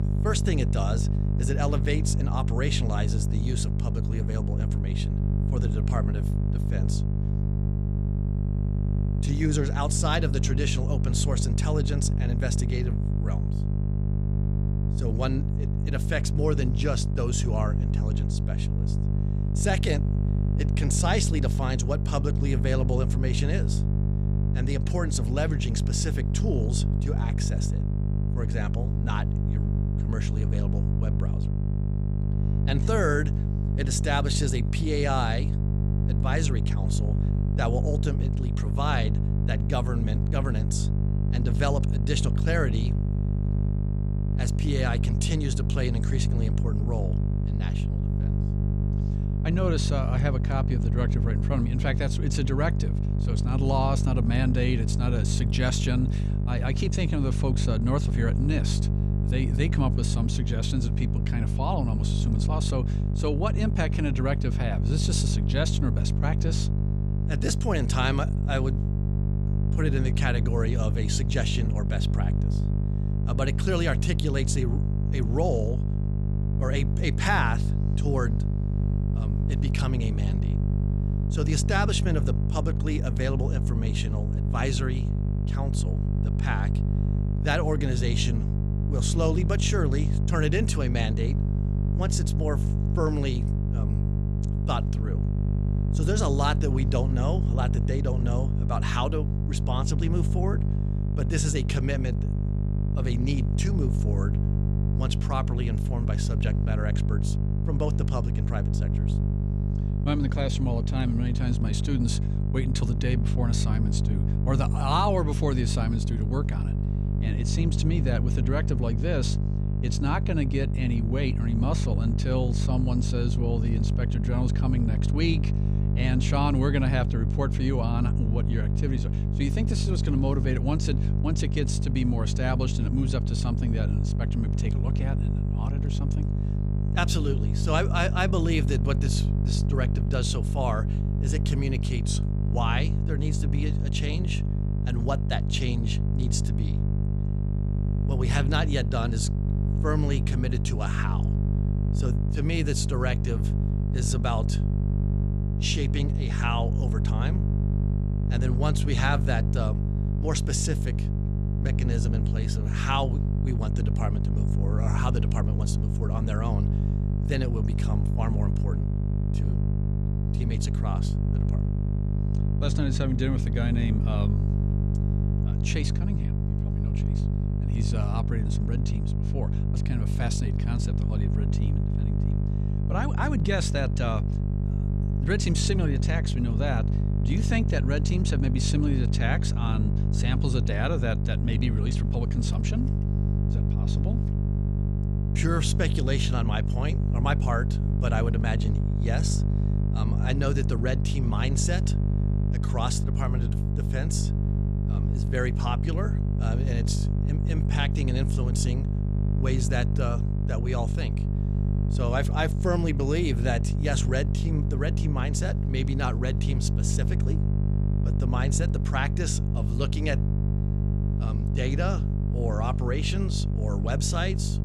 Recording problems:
electrical hum; loud; throughout; 50 Hz, 5 dB below the speech

